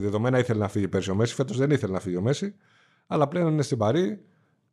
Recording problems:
abrupt cut into speech; at the start

